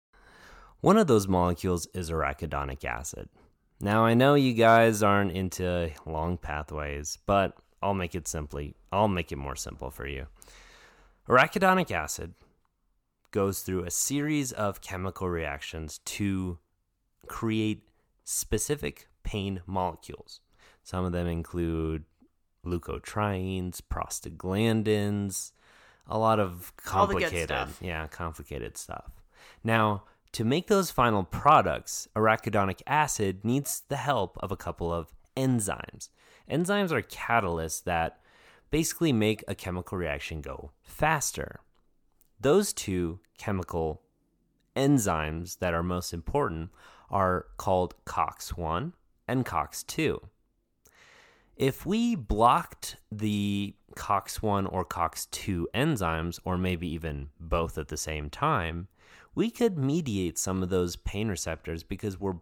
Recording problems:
none

